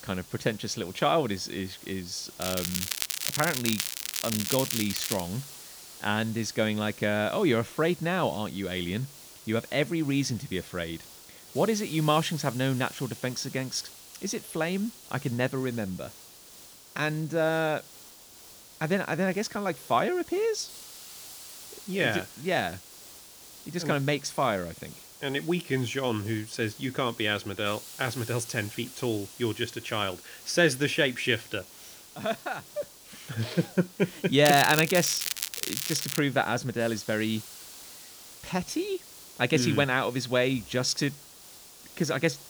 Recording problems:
crackling; loud; from 2.5 to 5 s and from 34 to 36 s; 2 dB below the speech
hiss; noticeable; throughout; 15 dB below the speech

